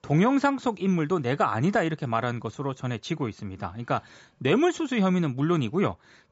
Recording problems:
high frequencies cut off; noticeable; nothing above 8 kHz

